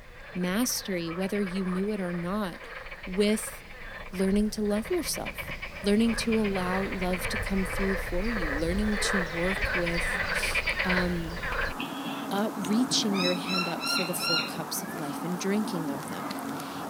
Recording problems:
animal sounds; loud; throughout; 2 dB below the speech

